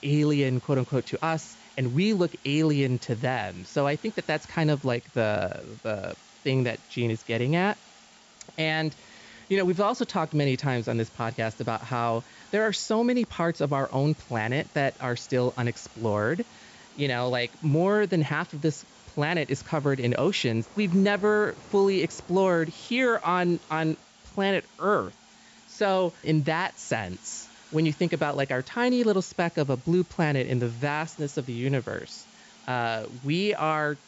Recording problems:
high frequencies cut off; noticeable; nothing above 8 kHz
rain or running water; faint; throughout; 30 dB below the speech
hiss; faint; throughout; 25 dB below the speech

